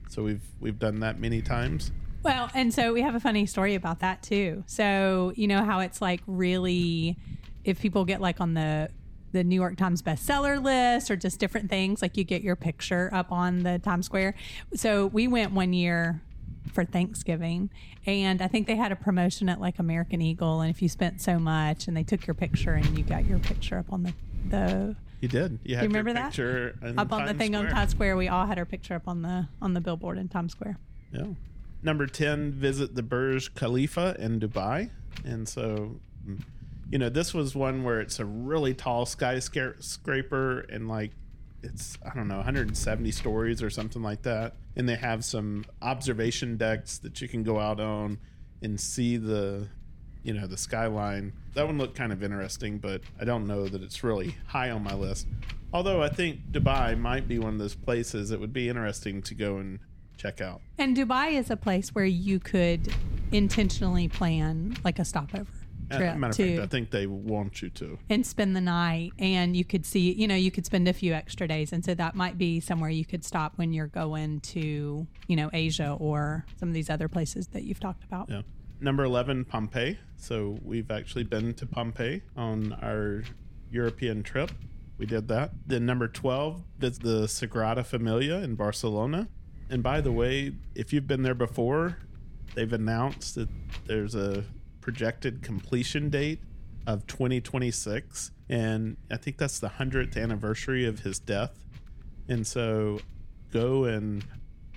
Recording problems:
wind noise on the microphone; occasional gusts; 20 dB below the speech

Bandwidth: 17 kHz